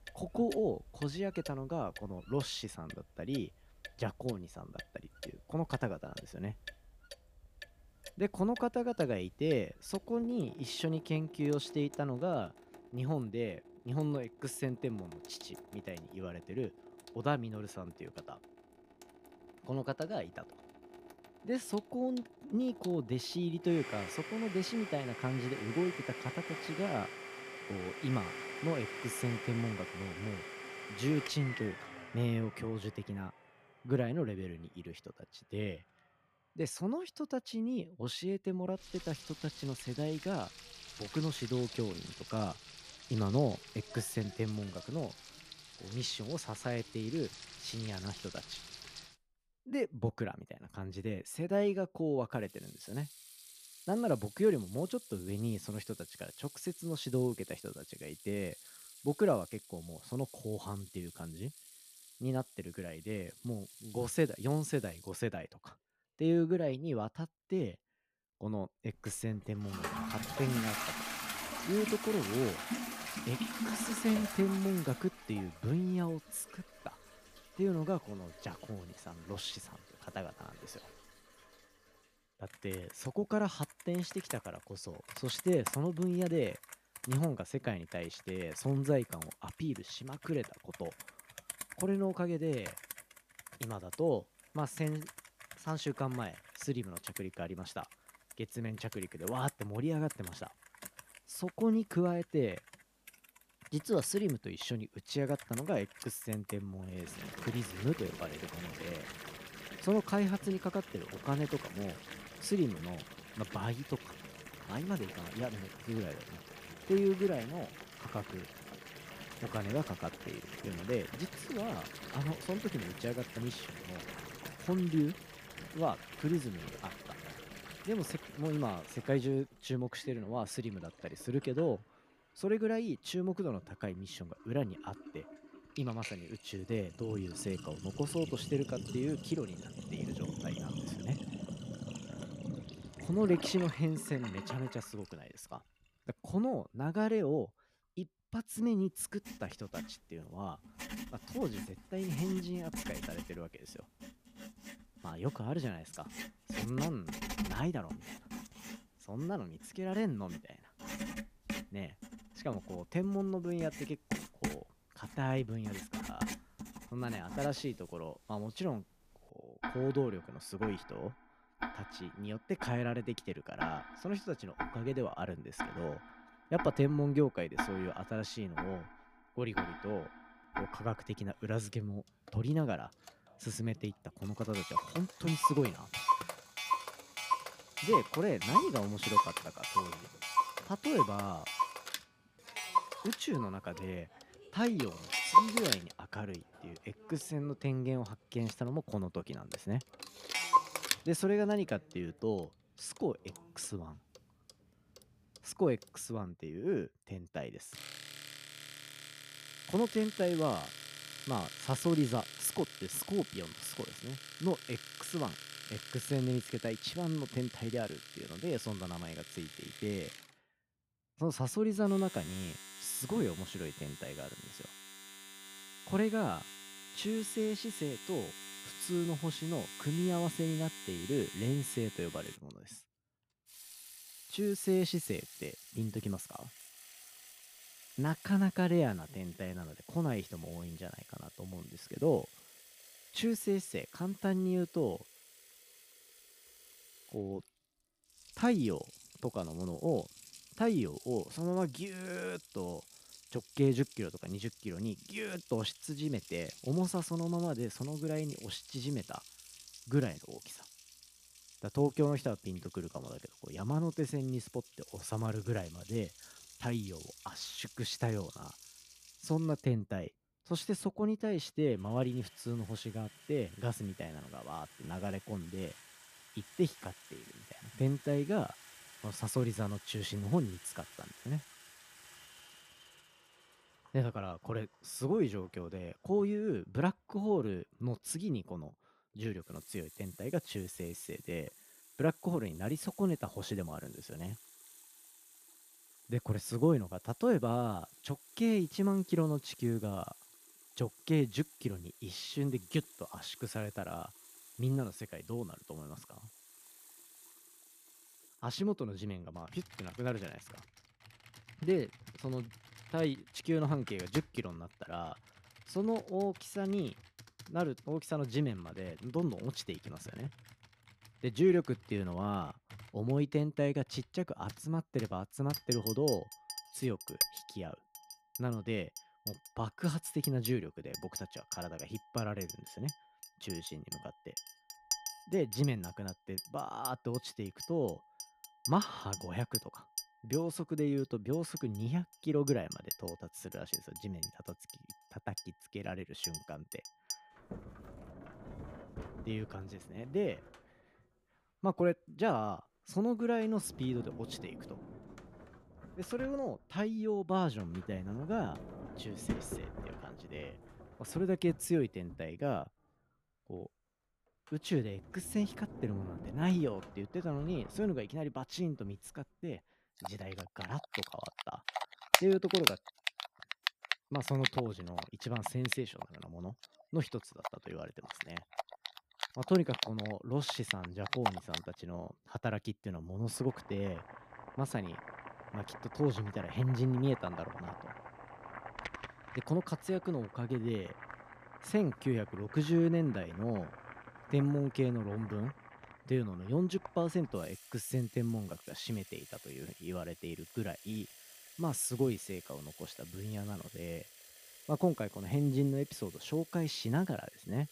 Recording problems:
household noises; loud; throughout; 7 dB below the speech

